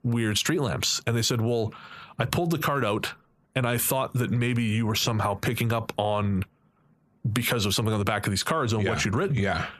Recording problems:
squashed, flat; heavily

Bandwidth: 14.5 kHz